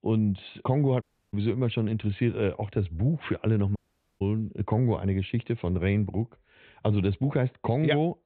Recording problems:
high frequencies cut off; severe; nothing above 4 kHz
audio cutting out; at 1 s and at 4 s

